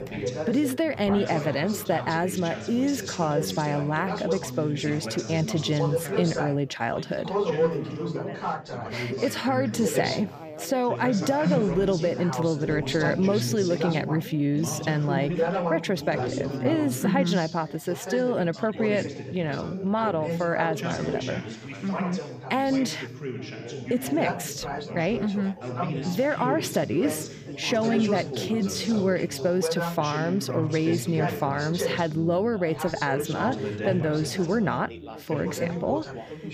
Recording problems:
background chatter; loud; throughout; 4 voices, 5 dB below the speech

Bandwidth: 15 kHz